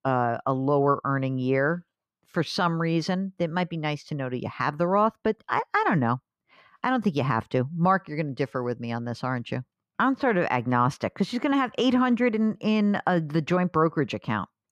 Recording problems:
muffled; slightly; fading above 3.5 kHz

